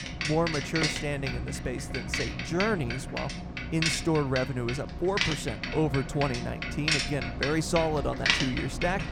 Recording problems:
traffic noise; loud; throughout; 1 dB below the speech

